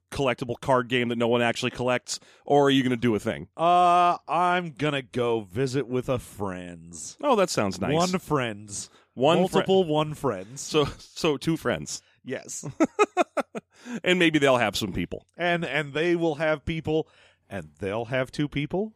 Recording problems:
none

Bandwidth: 14.5 kHz